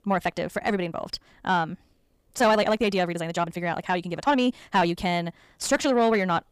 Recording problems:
wrong speed, natural pitch; too fast; 1.8 times normal speed
distortion; slight; 10 dB below the speech

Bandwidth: 15 kHz